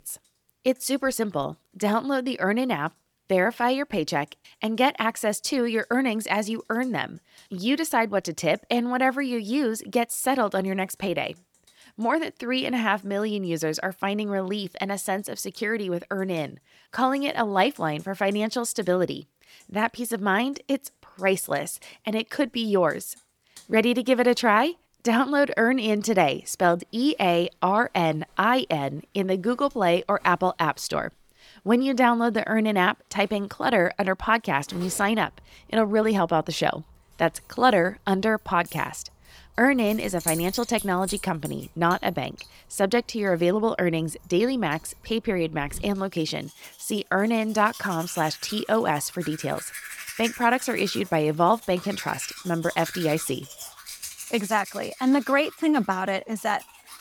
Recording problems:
household noises; noticeable; throughout; 15 dB below the speech

